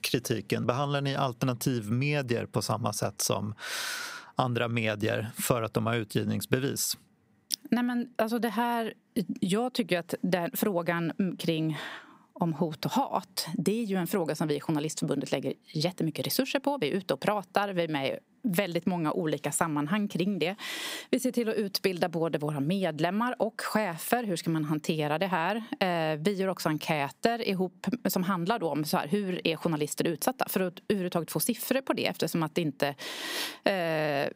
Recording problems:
squashed, flat; somewhat

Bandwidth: 15.5 kHz